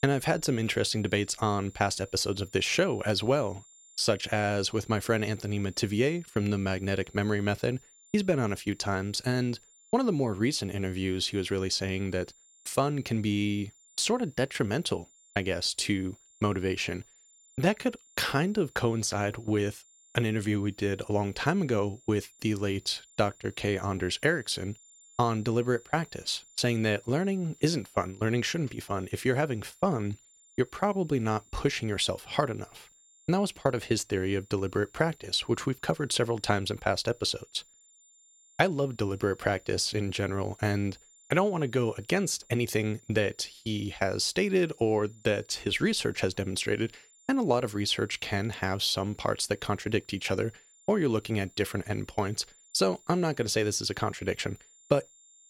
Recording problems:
high-pitched whine; faint; throughout; 7 kHz, 25 dB below the speech

